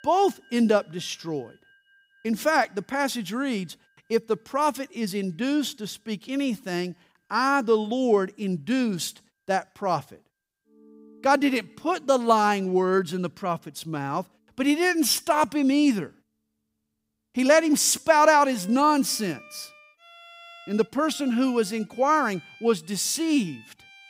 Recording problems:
background music; faint; throughout; 25 dB below the speech

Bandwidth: 15.5 kHz